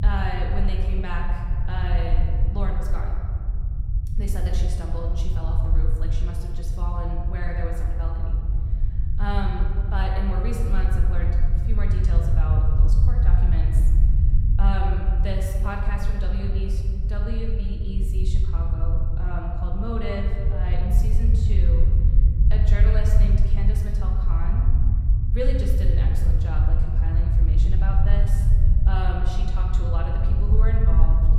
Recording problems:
room echo; noticeable; dies away in 1.6 s
off-mic speech; somewhat distant
low rumble; loud; throughout; 6 dB below the speech

